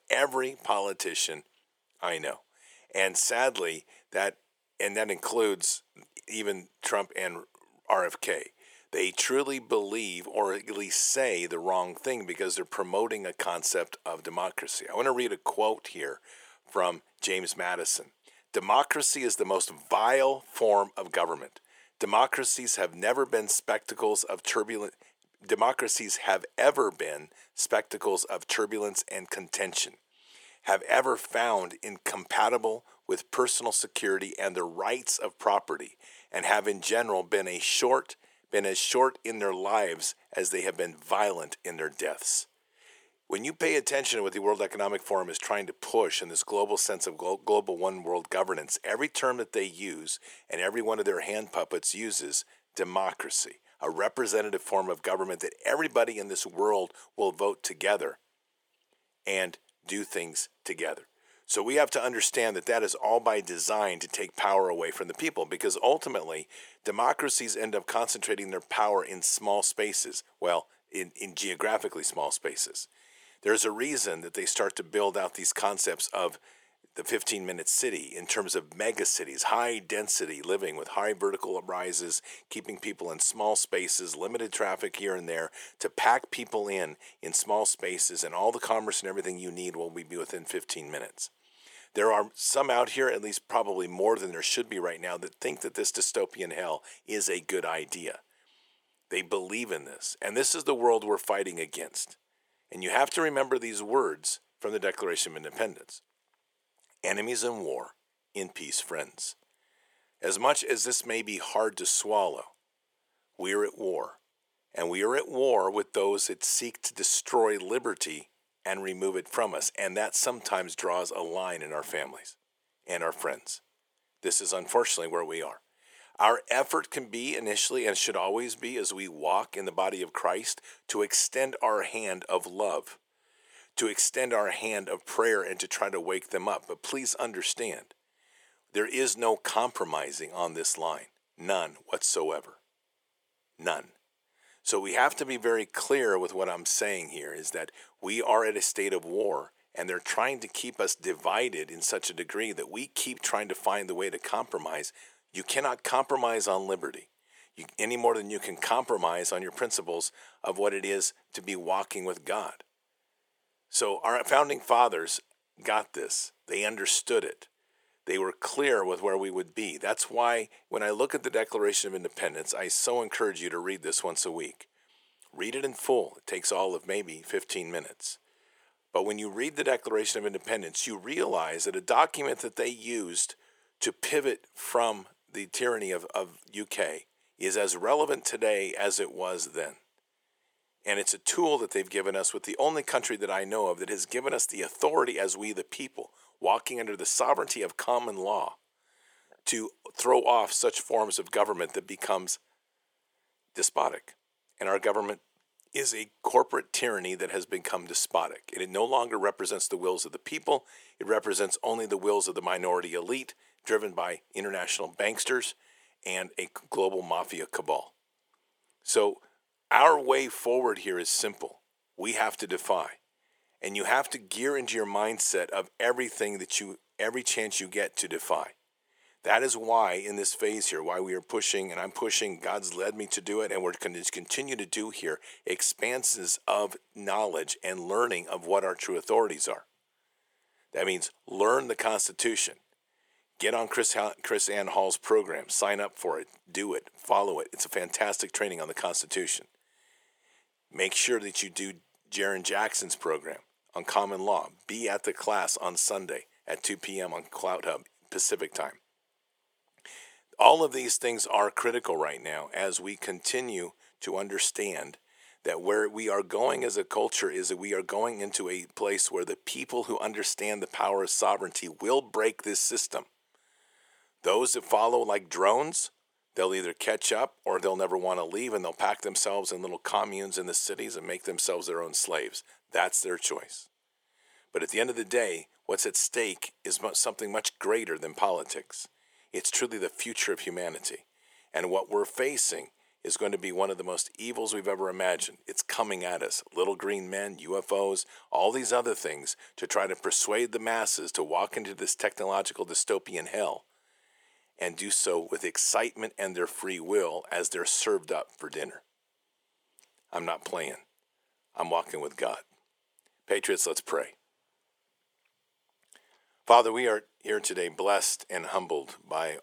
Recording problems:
thin; very; fading below 400 Hz

